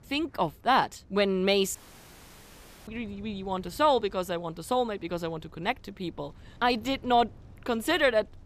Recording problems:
wind in the background; faint; throughout; 25 dB below the speech
audio cutting out; at 2 s for 1 s

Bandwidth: 14.5 kHz